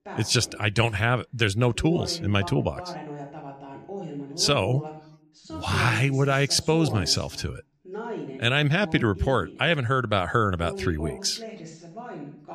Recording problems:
voice in the background; noticeable; throughout; 15 dB below the speech

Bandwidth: 14.5 kHz